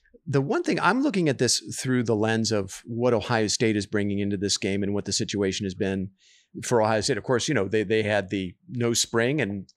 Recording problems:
none

